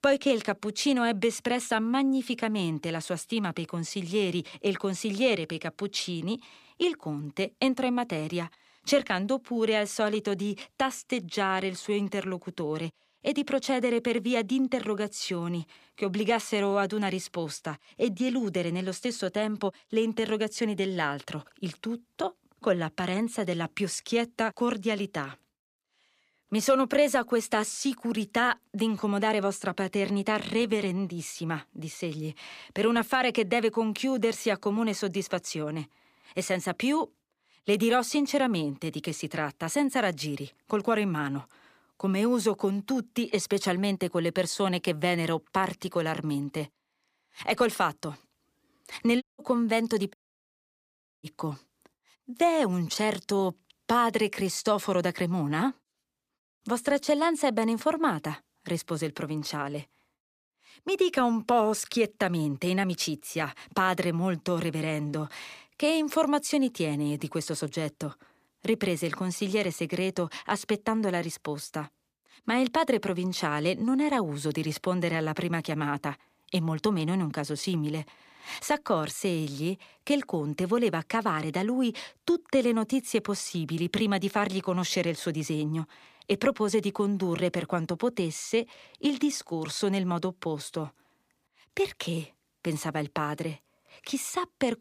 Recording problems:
audio cutting out; at 49 s and at 50 s for 1 s

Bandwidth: 15 kHz